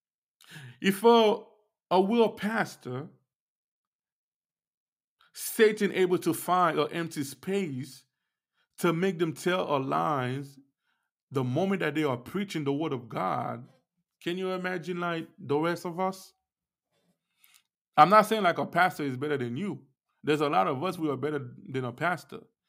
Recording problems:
none

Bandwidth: 15.5 kHz